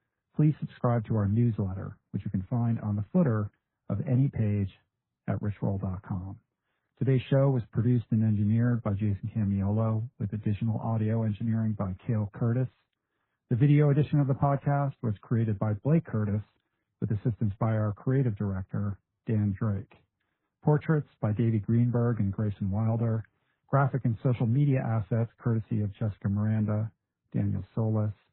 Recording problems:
garbled, watery; badly; nothing above 3.5 kHz
muffled; very slightly; fading above 1.5 kHz

